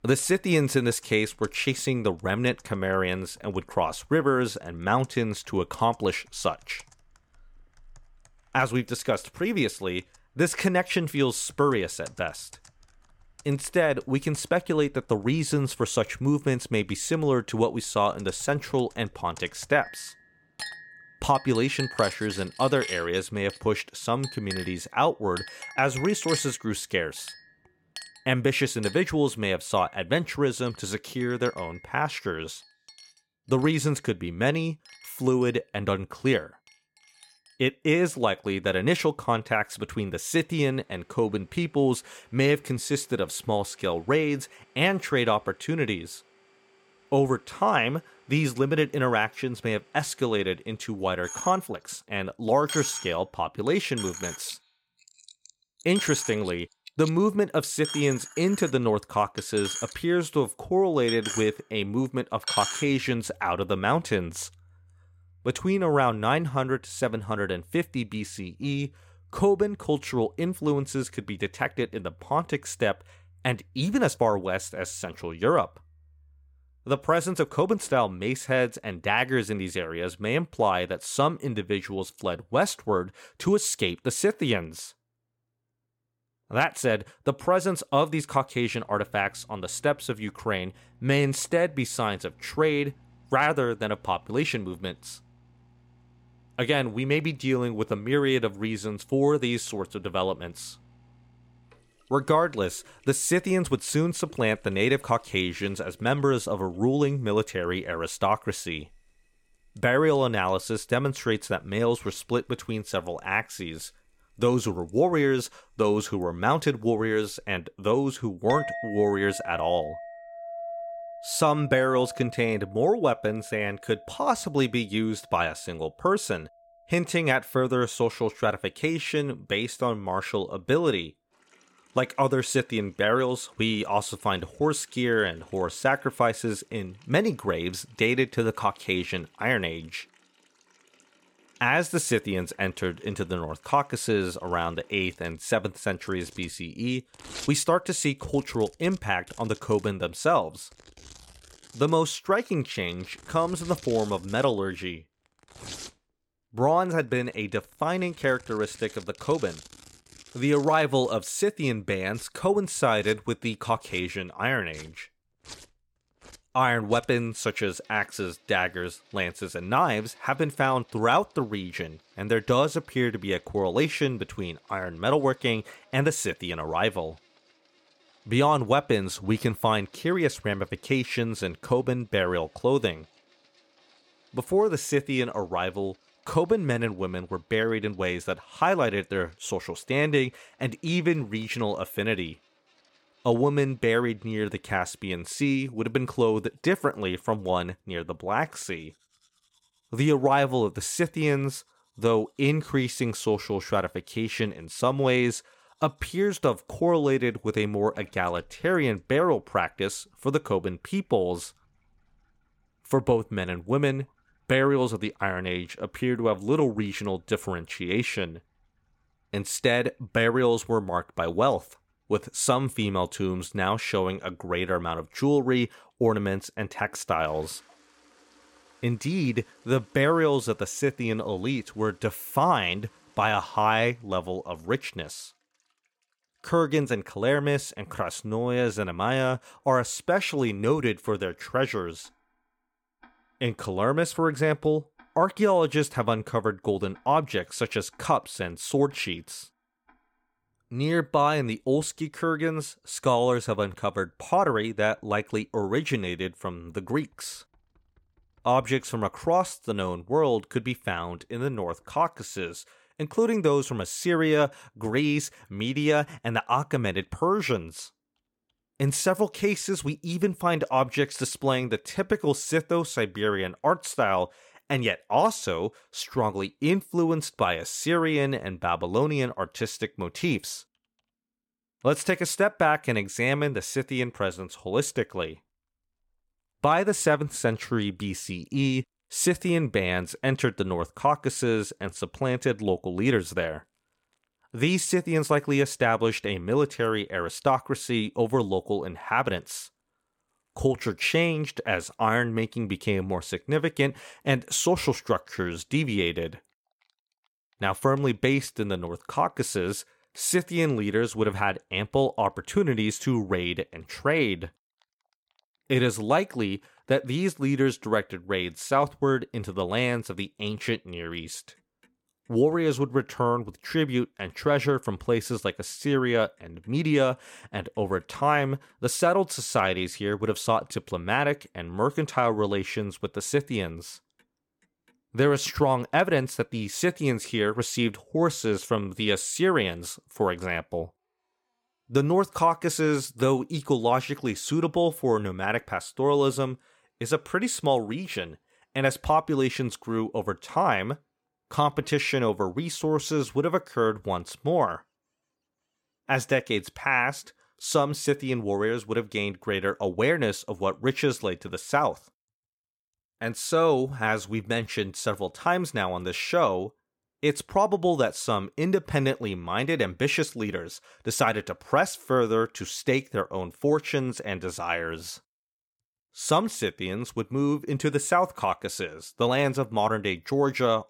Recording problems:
household noises; noticeable; throughout; 15 dB below the speech

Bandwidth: 17 kHz